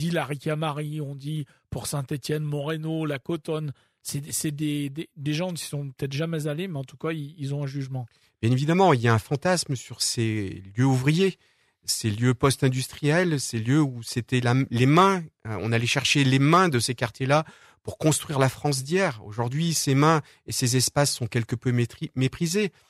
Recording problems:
abrupt cut into speech; at the start

